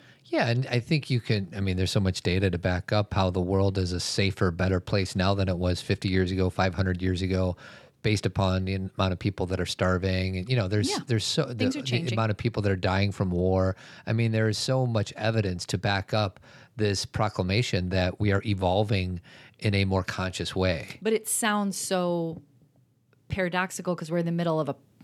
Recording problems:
none

